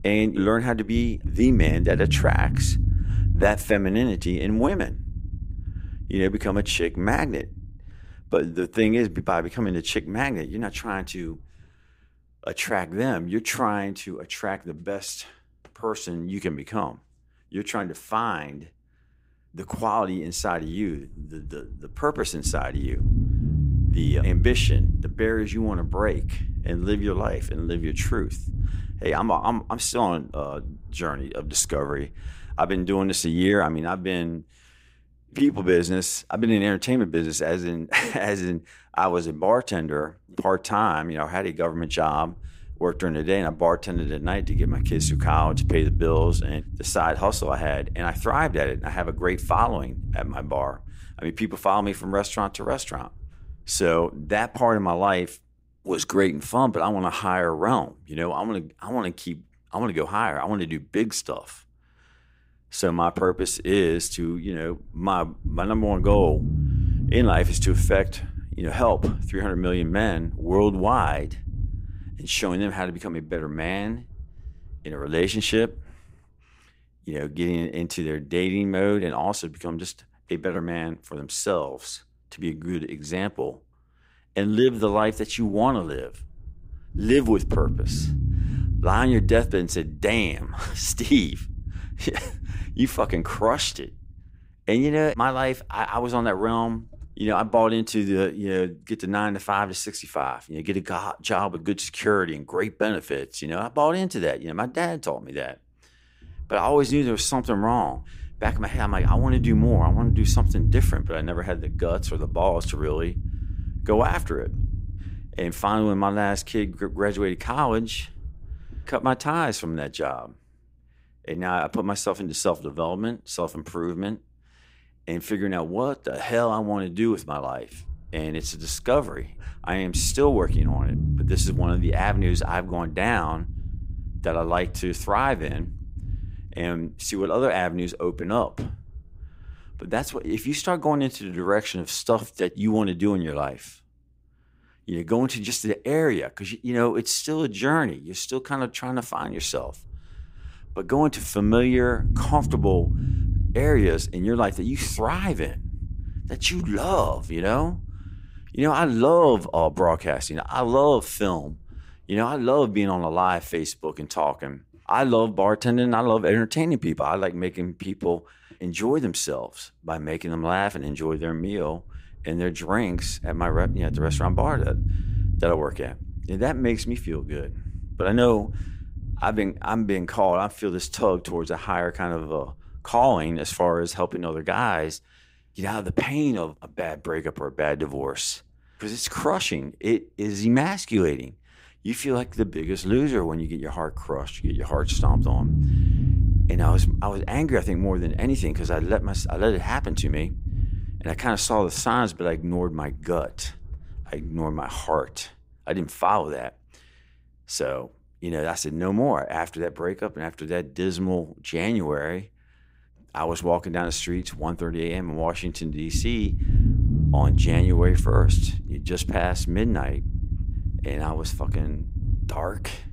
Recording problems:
low rumble; noticeable; throughout; 15 dB below the speech

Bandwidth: 15.5 kHz